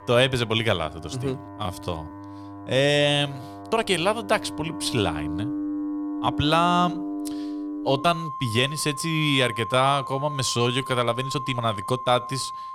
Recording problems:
background music; loud; throughout; 10 dB below the speech
uneven, jittery; strongly; from 1 to 12 s

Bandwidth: 17 kHz